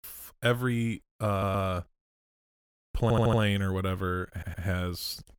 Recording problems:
audio stuttering; at 1.5 s, at 3 s and at 4.5 s

